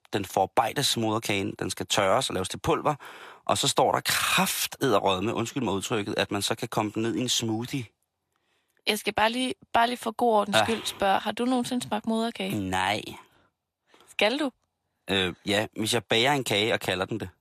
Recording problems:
thin; somewhat; fading below 650 Hz

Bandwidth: 14.5 kHz